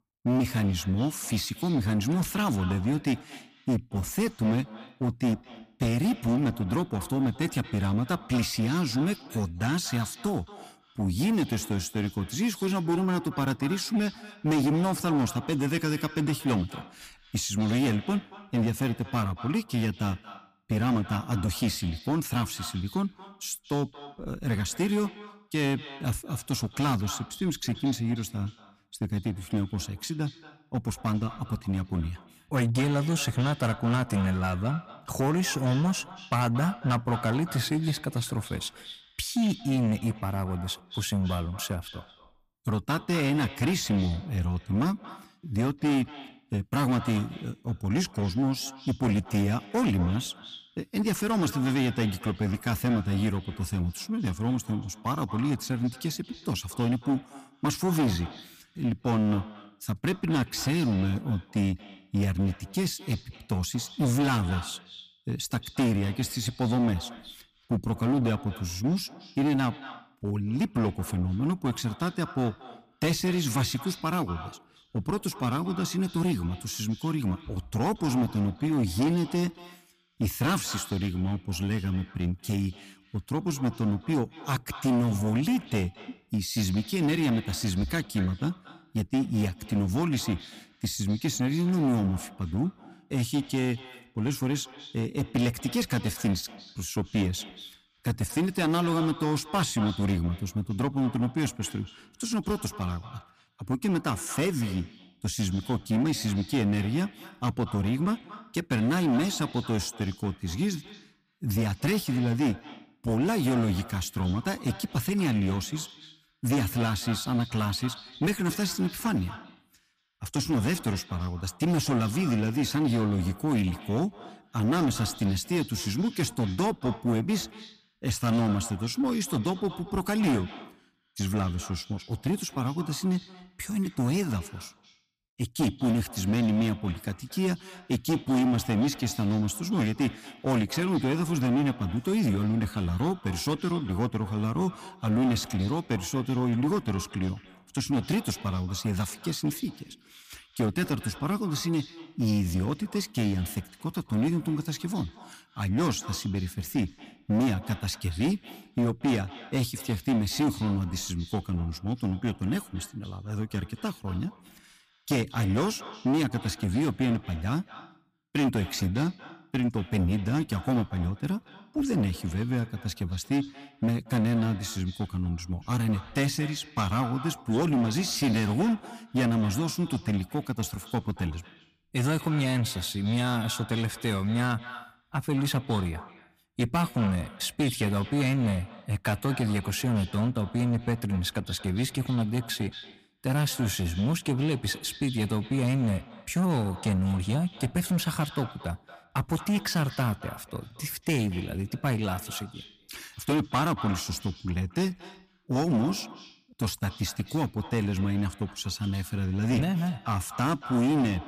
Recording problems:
echo of what is said; noticeable; throughout; 230 ms later, 15 dB below the speech
distortion; slight; 10% of the sound clipped

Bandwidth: 15 kHz